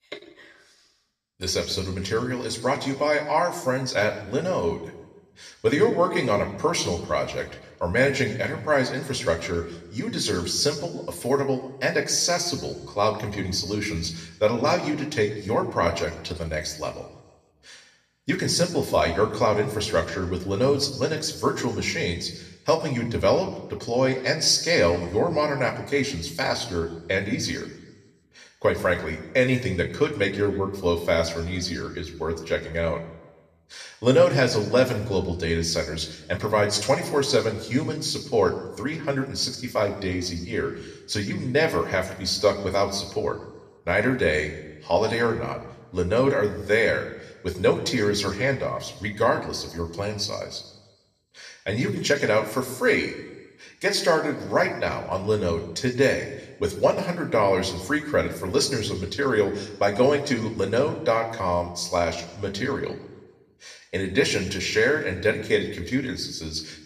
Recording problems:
room echo; slight; dies away in 0.9 s
off-mic speech; somewhat distant

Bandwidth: 14.5 kHz